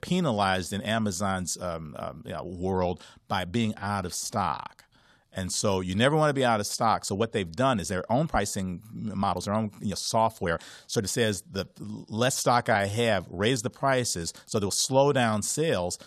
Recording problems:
uneven, jittery; strongly; from 2 to 15 s

